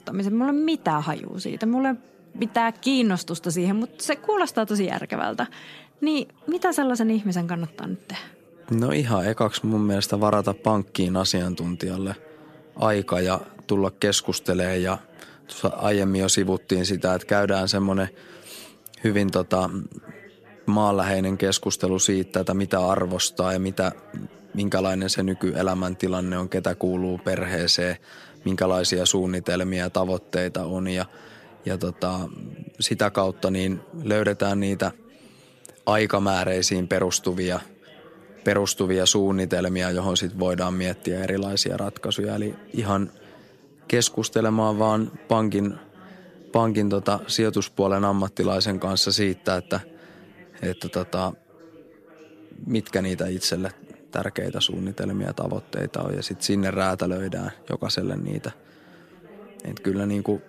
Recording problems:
background chatter; faint; throughout; 4 voices, 25 dB below the speech

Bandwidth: 14.5 kHz